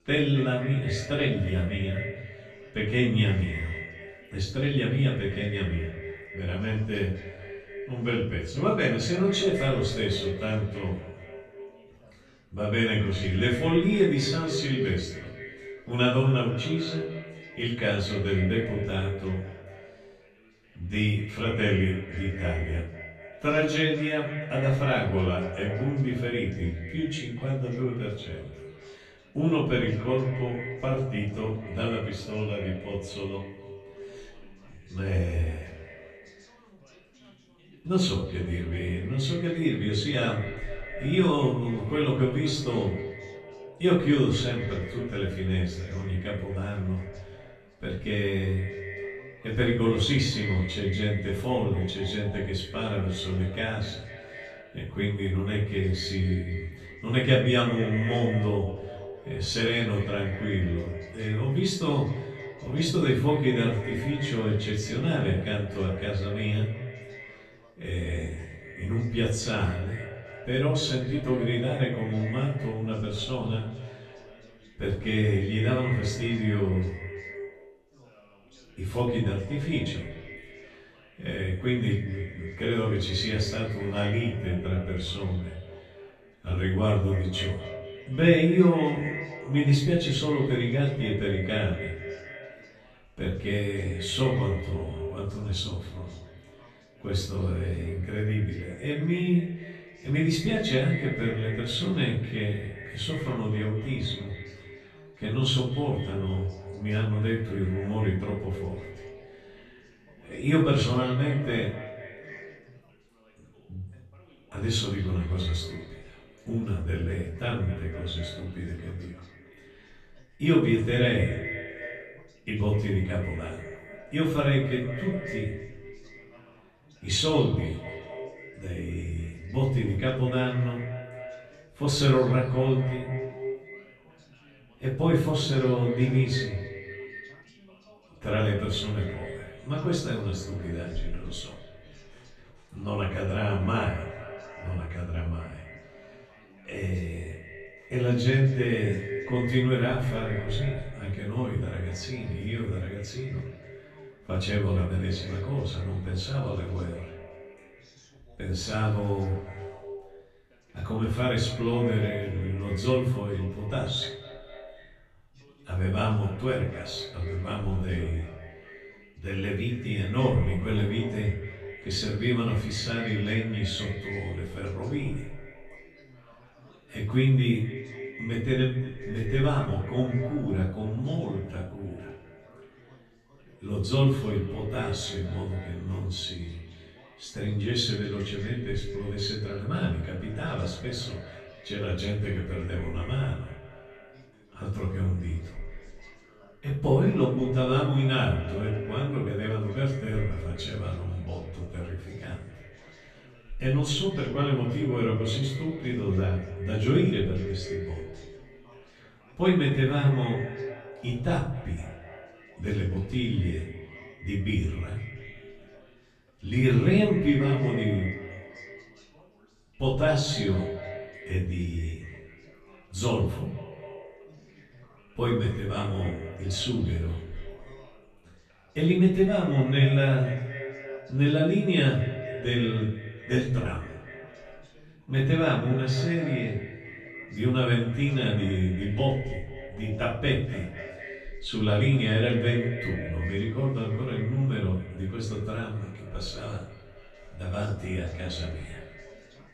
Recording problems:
off-mic speech; far
echo of what is said; noticeable; throughout; 240 ms later, 15 dB below the speech
room echo; noticeable; dies away in 0.5 s
background chatter; faint; throughout; 2 voices, 30 dB below the speech

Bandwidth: 13.5 kHz